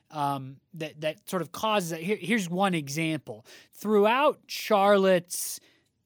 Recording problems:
none

